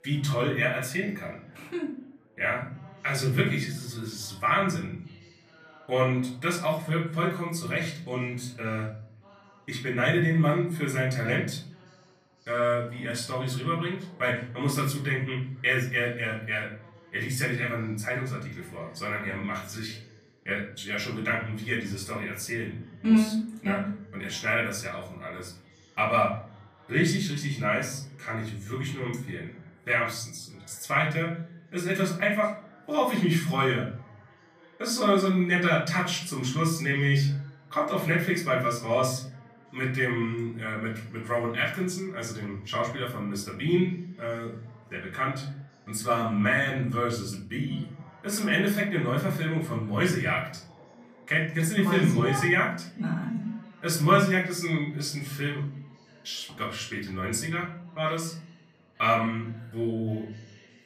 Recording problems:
off-mic speech; far
room echo; slight; dies away in 0.5 s
background chatter; faint; throughout; 4 voices, 25 dB below the speech

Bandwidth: 14.5 kHz